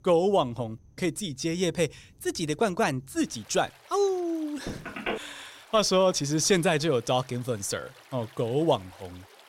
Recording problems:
rain or running water; faint; throughout; 25 dB below the speech
phone ringing; noticeable; at 4.5 s; peak 6 dB below the speech

